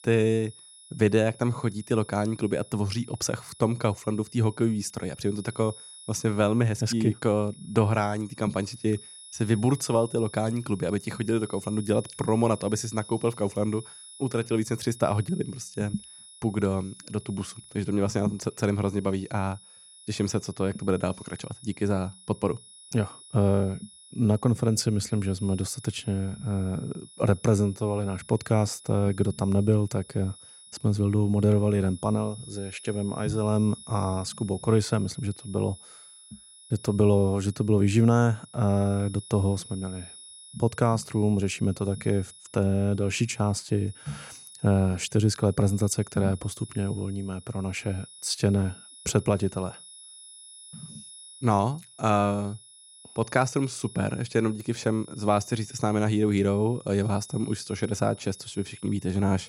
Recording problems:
high-pitched whine; noticeable; throughout; 10 kHz, 20 dB below the speech

